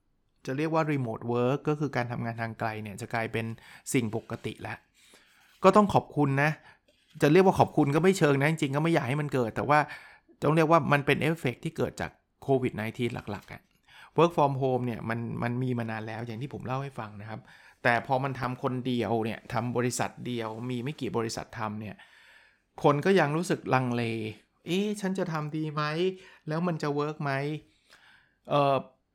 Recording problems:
none

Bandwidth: 18 kHz